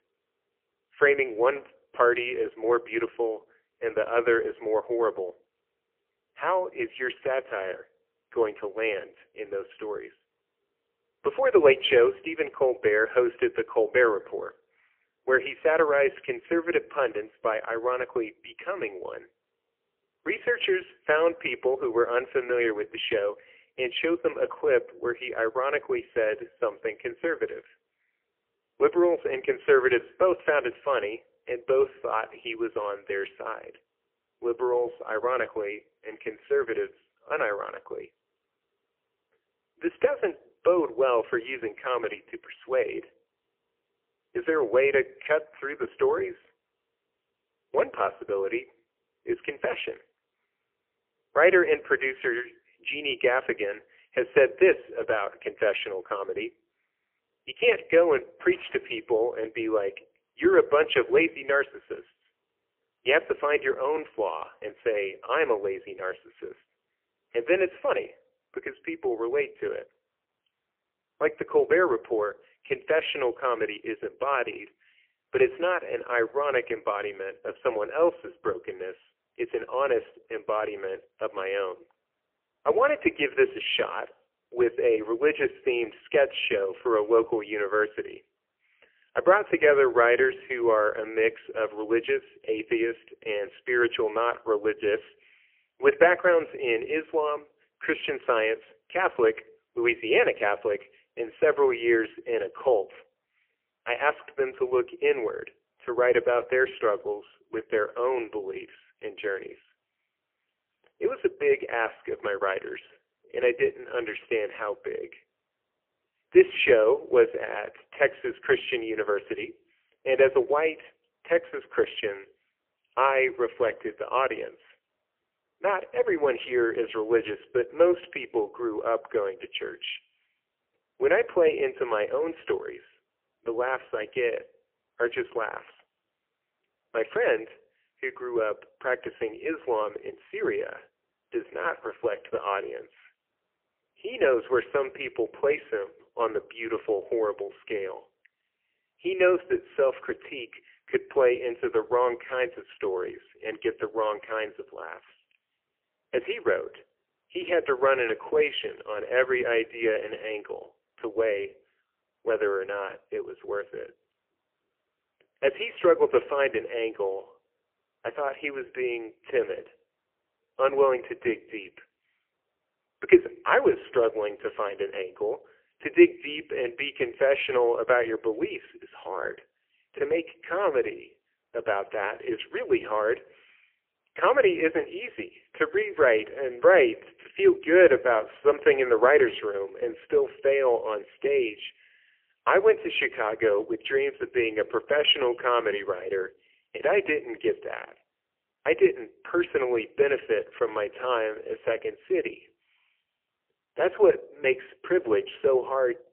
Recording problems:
phone-call audio; poor line; nothing above 3 kHz

